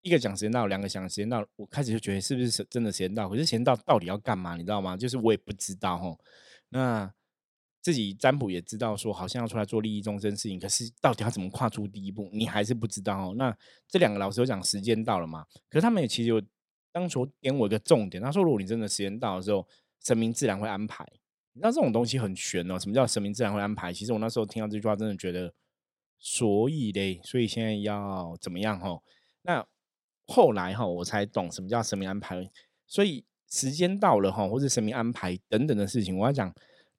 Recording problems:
none

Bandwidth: 16.5 kHz